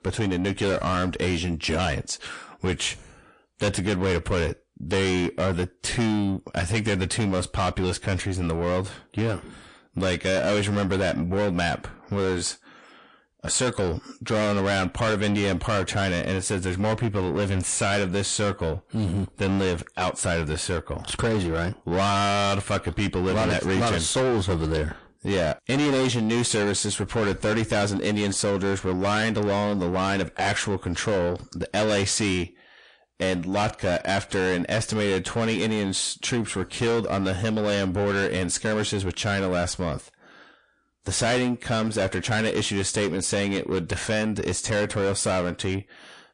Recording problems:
distortion; heavy; 6 dB below the speech
garbled, watery; slightly; nothing above 8 kHz

